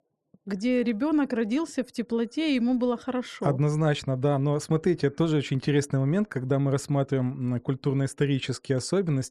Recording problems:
none

